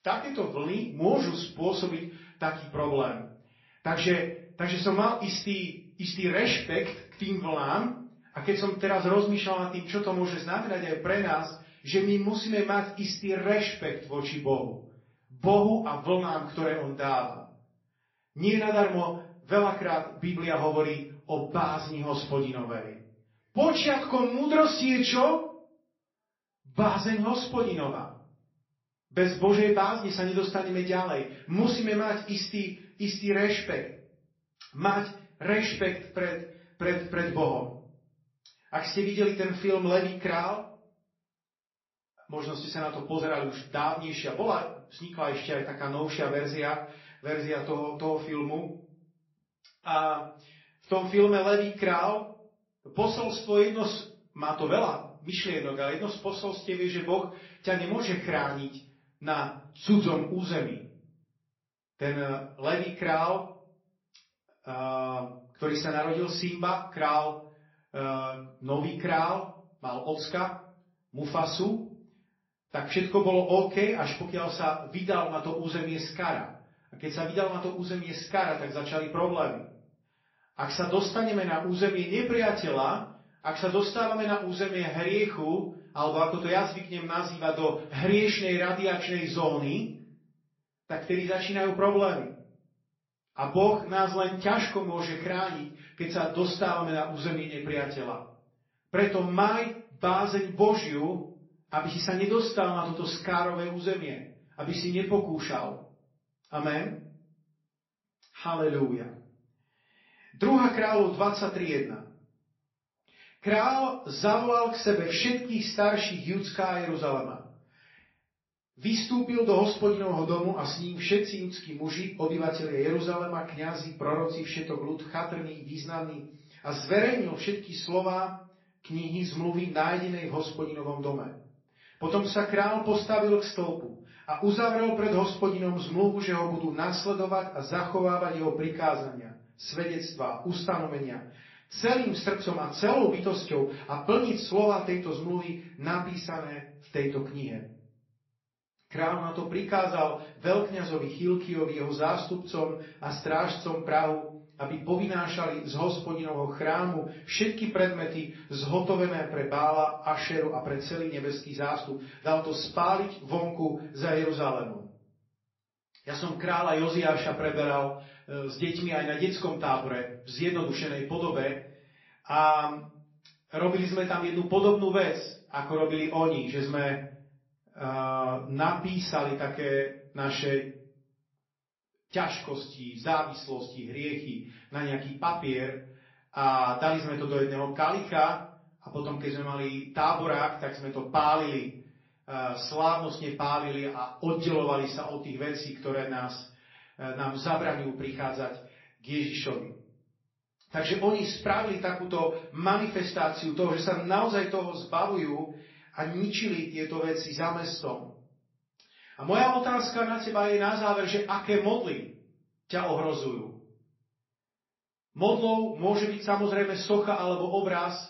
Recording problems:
off-mic speech; far
room echo; slight; dies away in 0.5 s
garbled, watery; slightly; nothing above 5.5 kHz

